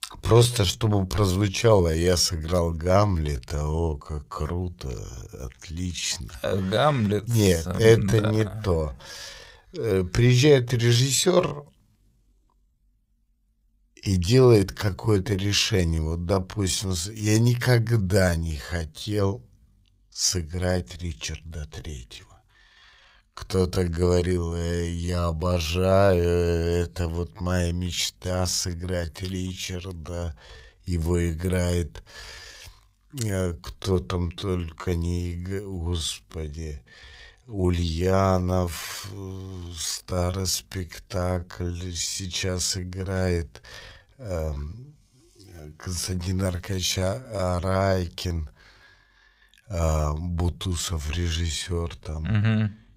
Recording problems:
wrong speed, natural pitch; too slow; 0.6 times normal speed

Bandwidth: 15.5 kHz